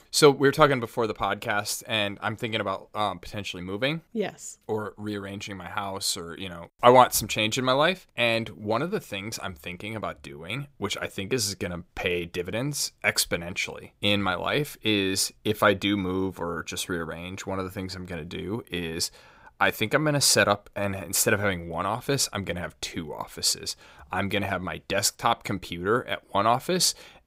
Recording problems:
none

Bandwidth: 15.5 kHz